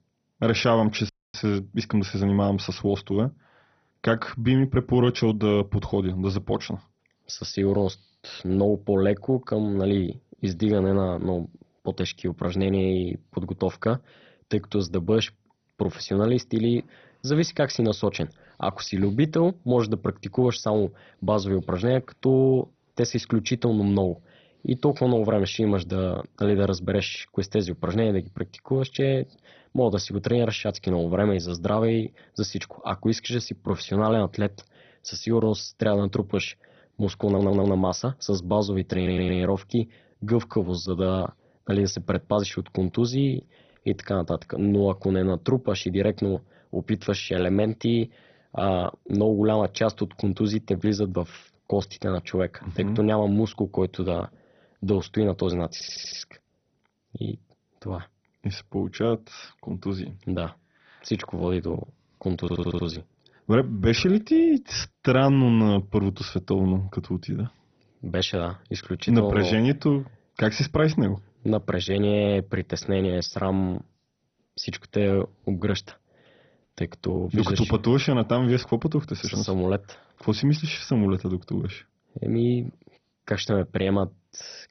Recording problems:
garbled, watery; badly; nothing above 6 kHz
audio cutting out; at 1 s
audio stuttering; 4 times, first at 37 s

